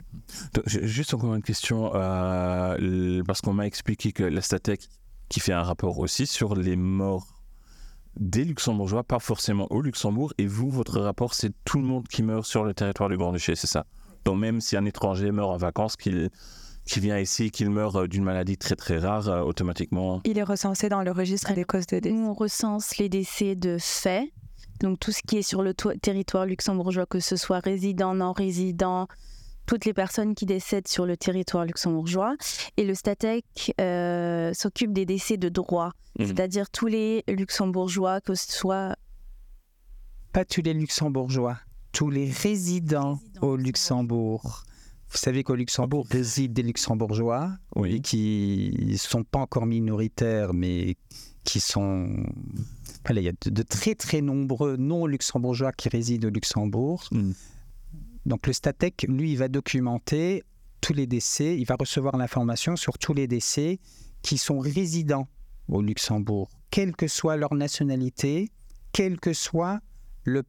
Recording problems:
squashed, flat; somewhat

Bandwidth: 18.5 kHz